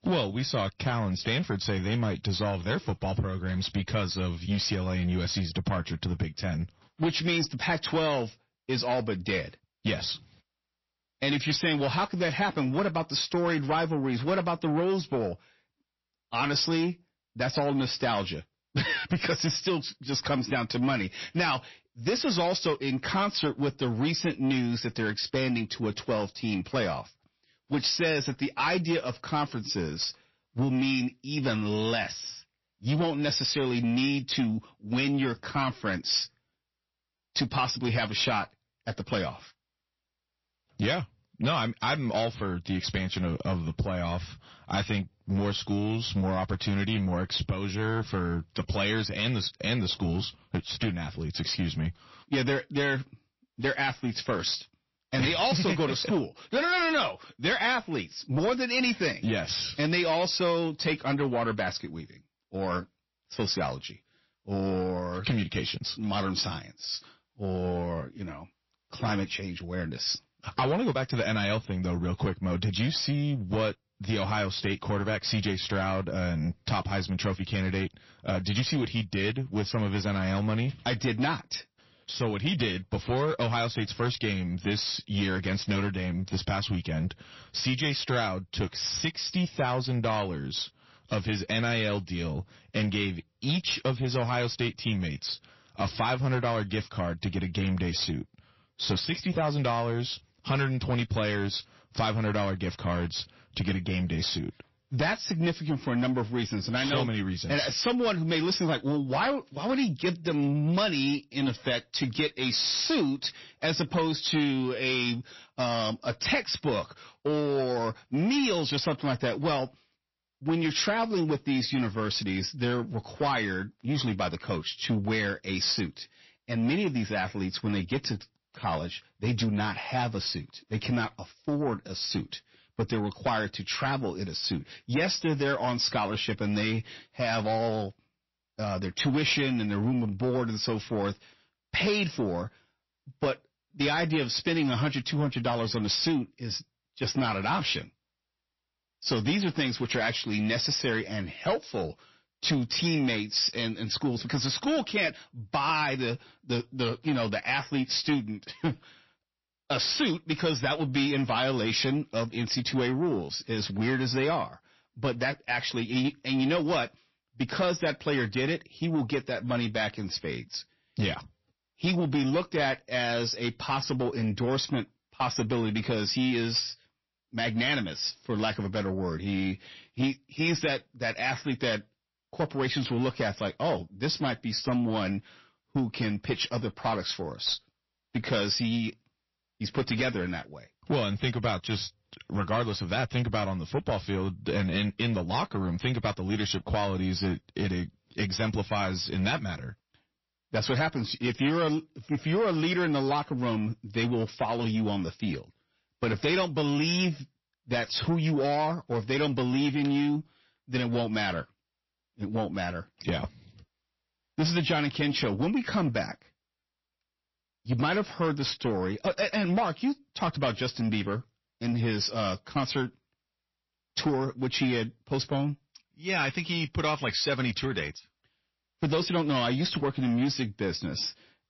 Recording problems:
distortion; slight; 10 dB below the speech
garbled, watery; slightly; nothing above 5.5 kHz

